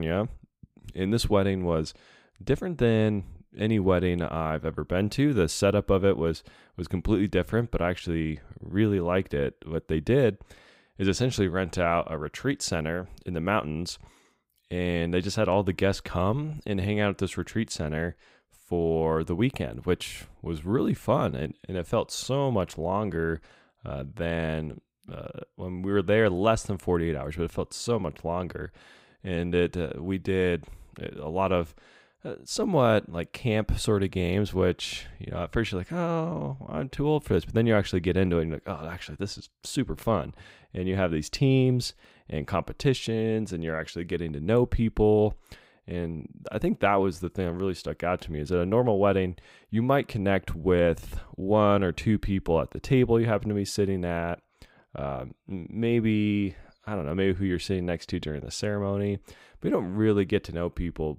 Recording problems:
abrupt cut into speech; at the start

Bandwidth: 15.5 kHz